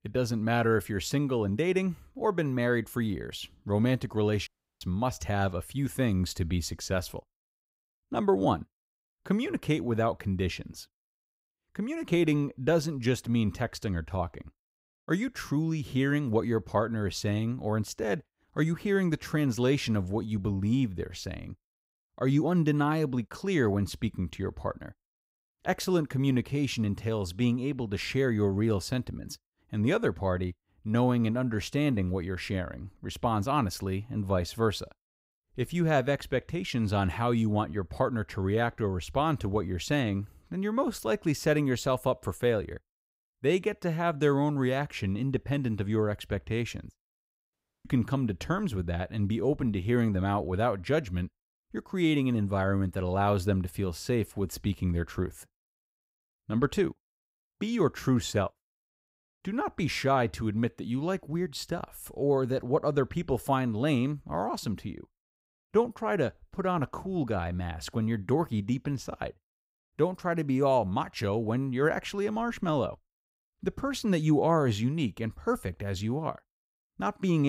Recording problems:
audio cutting out; at 4.5 s and at 48 s
abrupt cut into speech; at the end

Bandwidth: 15.5 kHz